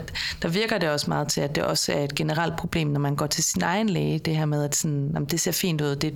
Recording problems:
squashed, flat; heavily

